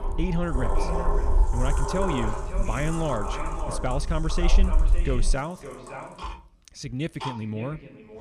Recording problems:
echo of what is said; strong; throughout; 560 ms later, 10 dB below the speech
household noises; loud; throughout; 5 dB below the speech
low rumble; faint; until 5.5 s; 20 dB below the speech

